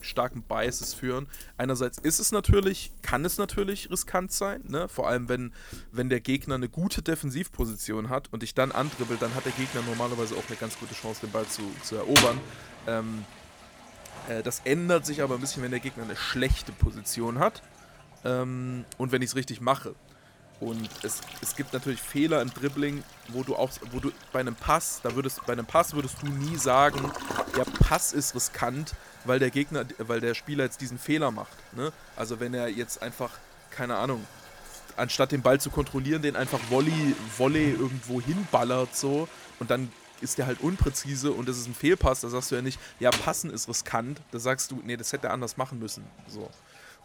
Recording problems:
household noises; loud; throughout; 8 dB below the speech

